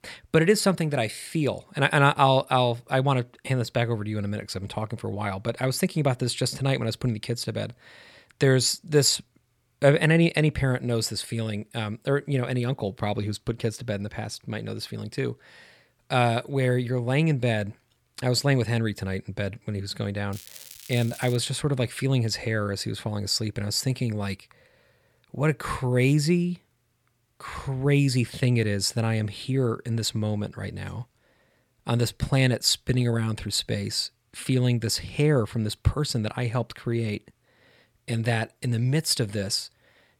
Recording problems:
crackling; noticeable; from 20 to 21 s; 20 dB below the speech

